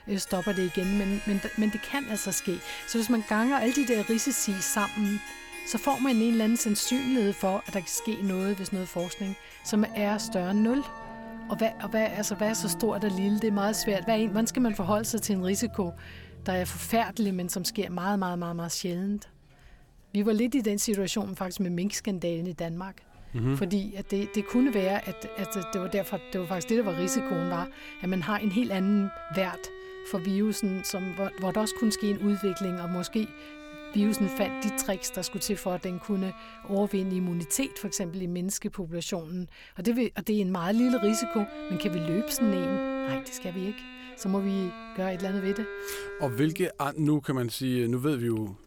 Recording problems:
background music; loud; throughout; 10 dB below the speech

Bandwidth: 17.5 kHz